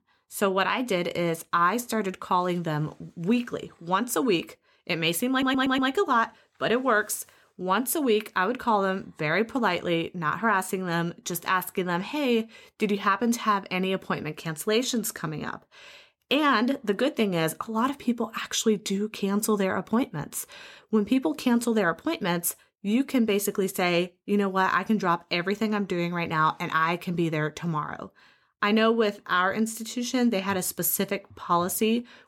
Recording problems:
audio stuttering; at 5.5 s

